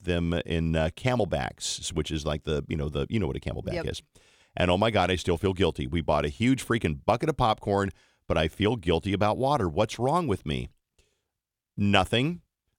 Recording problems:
none

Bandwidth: 17.5 kHz